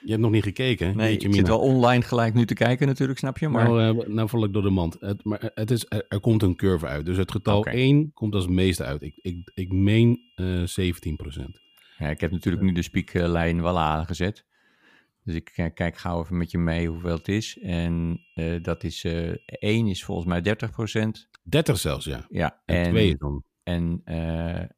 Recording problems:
high-pitched whine; faint; until 7.5 s, from 9 to 14 s and from 17 to 20 s; 3 kHz, 35 dB below the speech

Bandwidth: 15 kHz